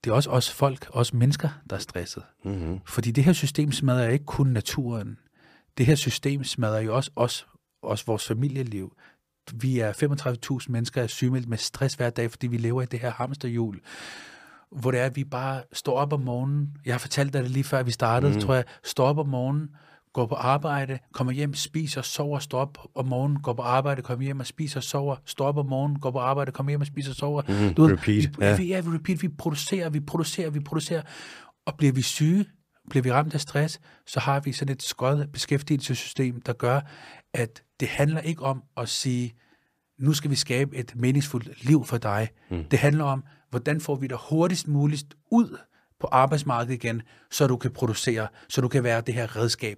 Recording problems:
none

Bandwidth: 15 kHz